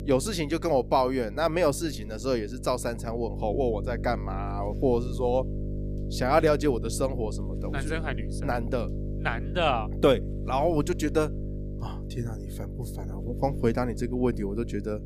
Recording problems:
electrical hum; noticeable; throughout; 50 Hz, 15 dB below the speech

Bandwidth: 15 kHz